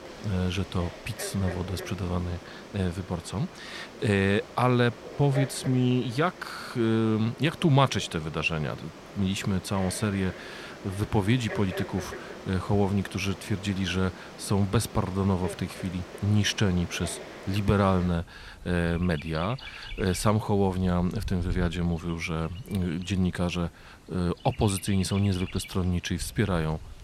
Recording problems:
animal sounds; noticeable; throughout; 15 dB below the speech

